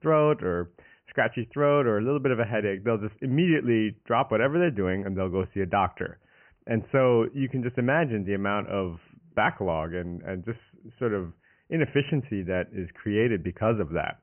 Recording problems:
high frequencies cut off; severe; nothing above 3 kHz

